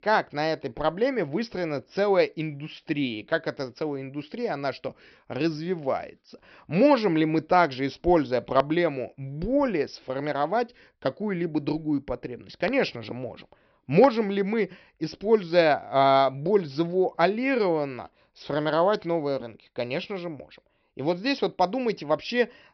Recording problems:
high frequencies cut off; noticeable; nothing above 5.5 kHz

